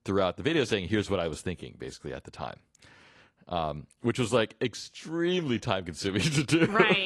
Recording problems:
garbled, watery; slightly; nothing above 11 kHz
abrupt cut into speech; at the end

